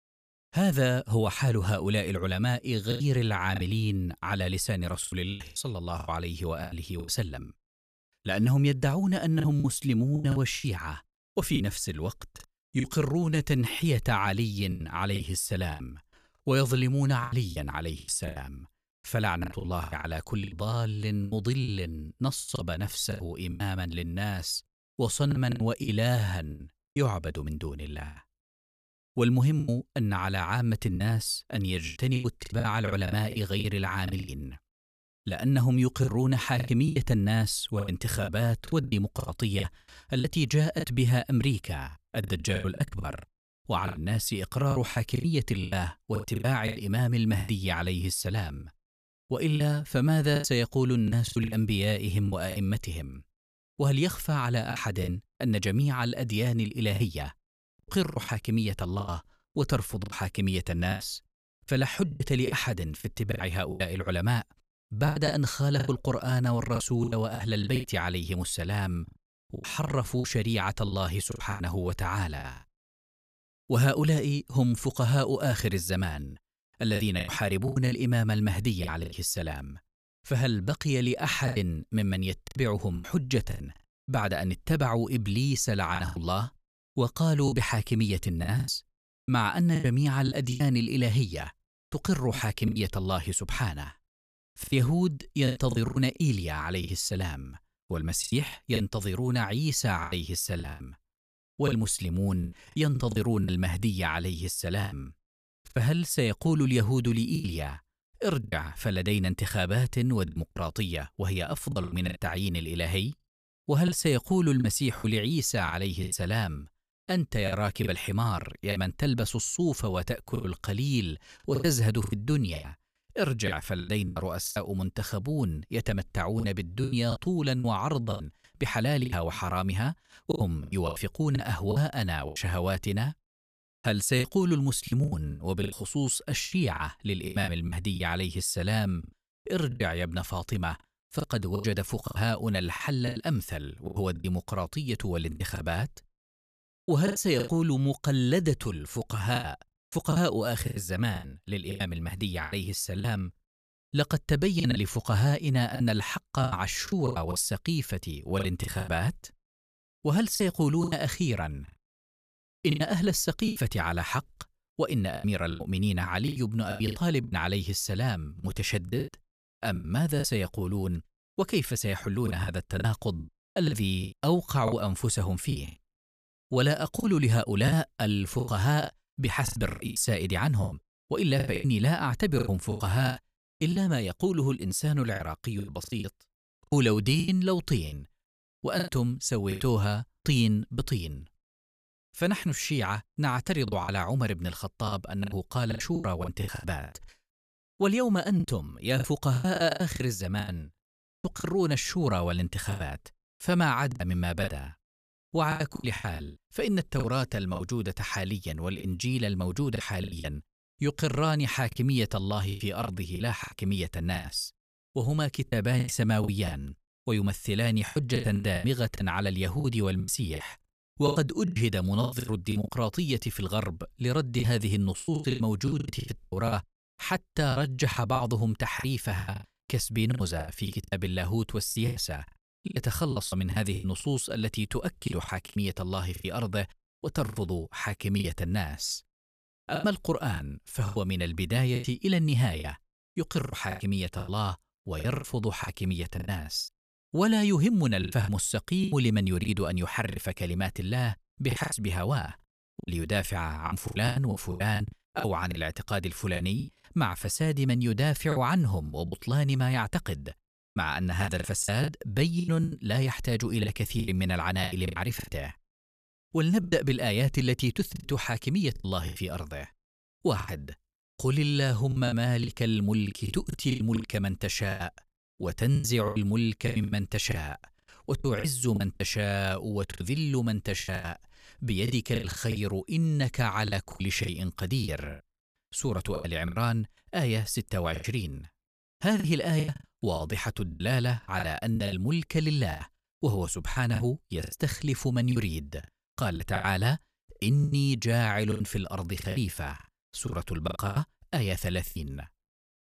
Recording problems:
choppy; very; 11% of the speech affected

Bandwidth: 14.5 kHz